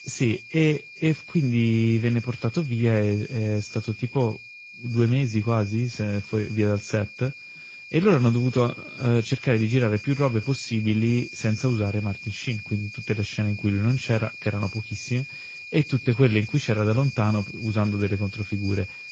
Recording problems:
garbled, watery; slightly
high-pitched whine; noticeable; throughout; 2.5 kHz, 15 dB below the speech

